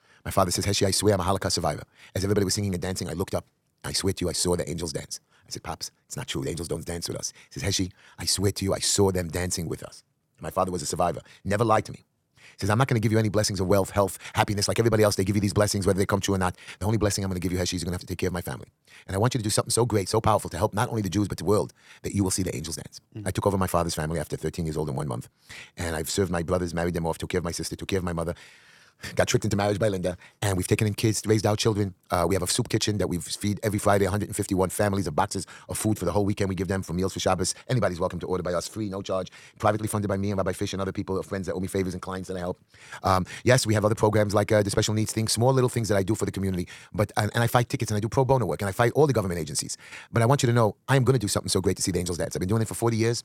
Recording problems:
wrong speed, natural pitch; too fast; 1.6 times normal speed

